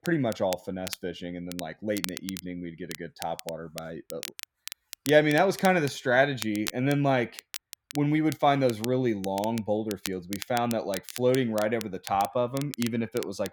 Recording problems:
crackle, like an old record; noticeable; 15 dB below the speech

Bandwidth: 18 kHz